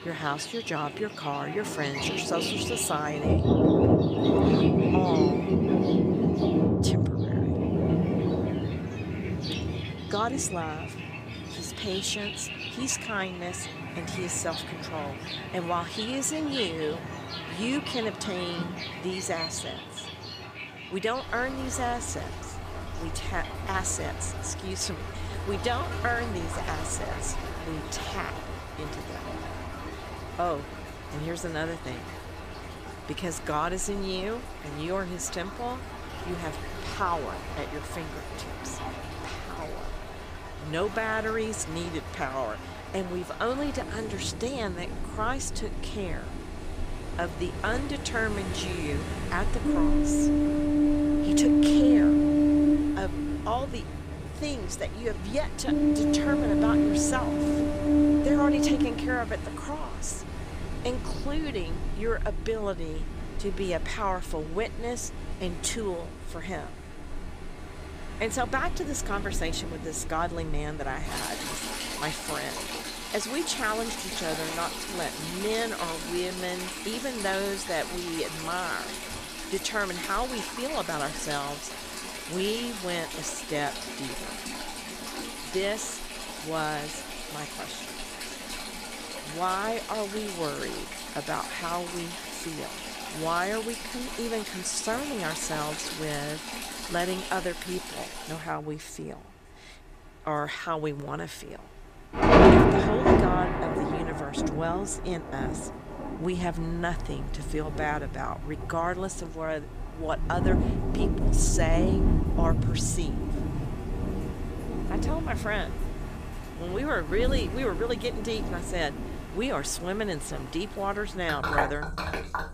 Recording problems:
rain or running water; very loud; throughout; 2 dB above the speech

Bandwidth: 15 kHz